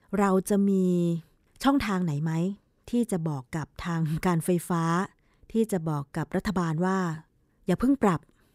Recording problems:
none

